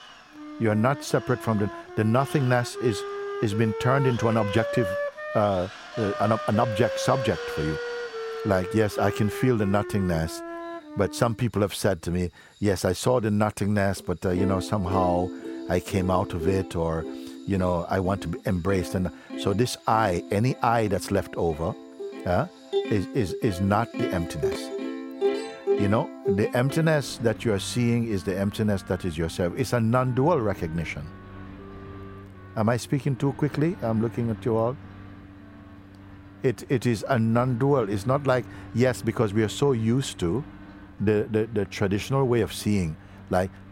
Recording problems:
background music; loud; throughout; 8 dB below the speech
machinery noise; noticeable; throughout; 20 dB below the speech
uneven, jittery; strongly; from 4 to 41 s

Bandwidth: 16 kHz